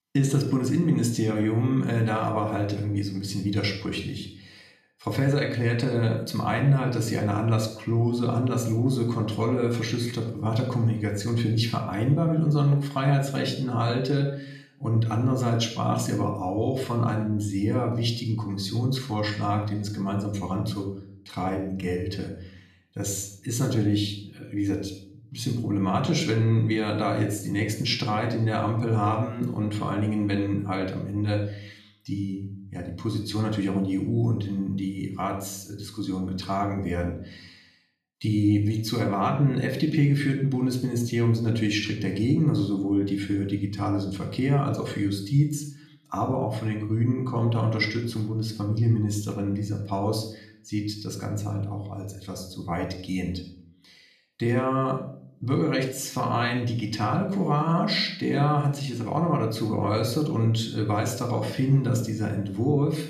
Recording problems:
room echo; slight; dies away in 0.5 s
off-mic speech; somewhat distant

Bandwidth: 14.5 kHz